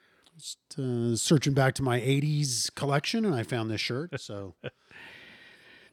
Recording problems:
none

